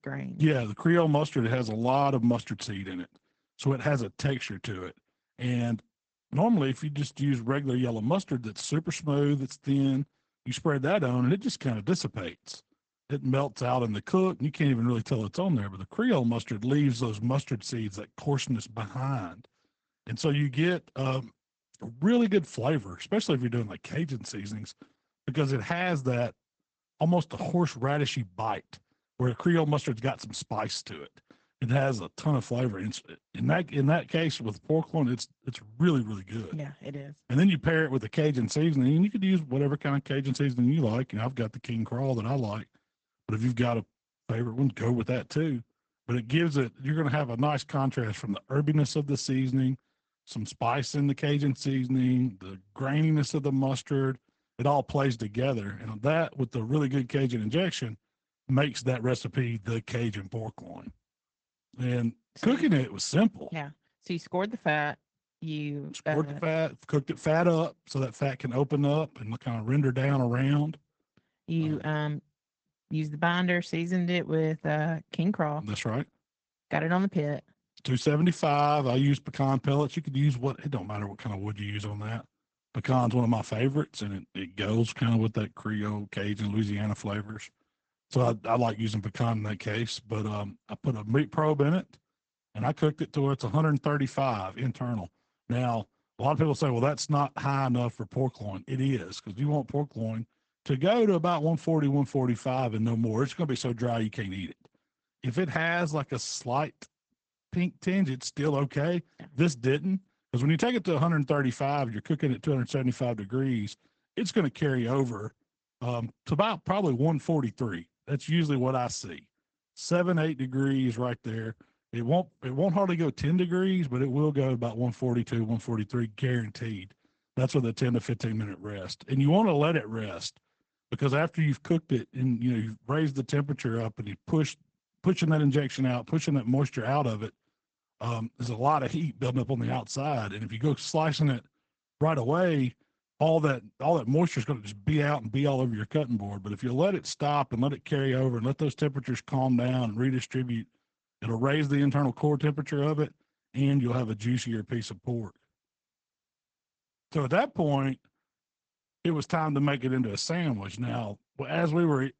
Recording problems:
high frequencies cut off; noticeable; nothing above 8 kHz
garbled, watery; slightly

